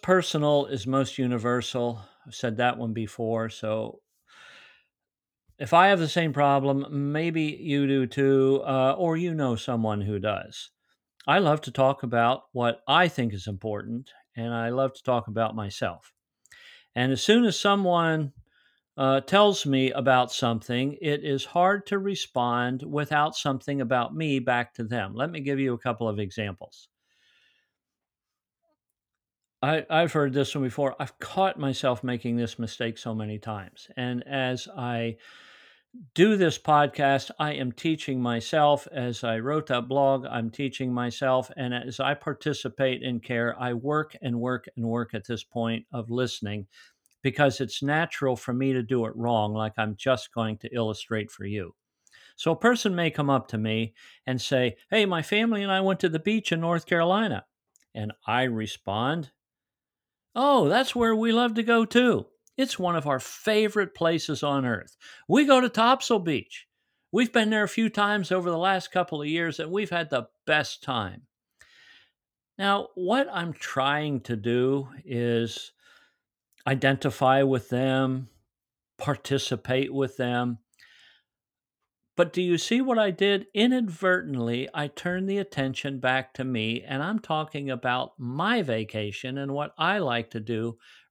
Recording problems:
none

